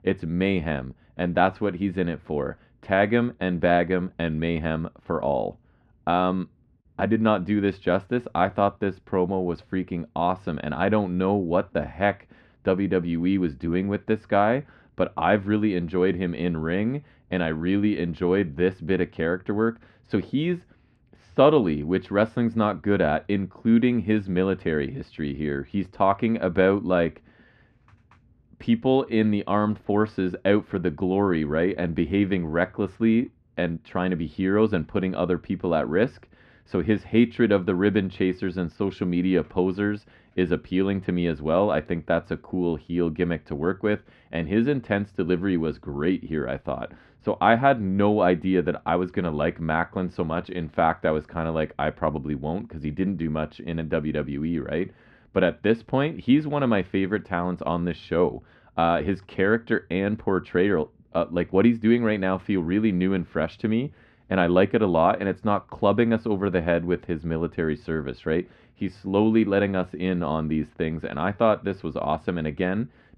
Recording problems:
muffled; very; fading above 1.5 kHz

